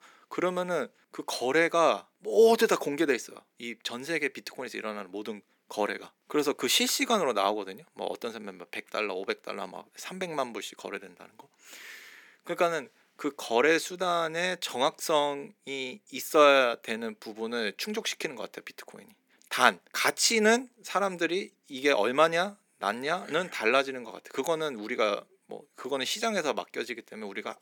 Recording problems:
thin; somewhat; fading below 250 Hz

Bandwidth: 18 kHz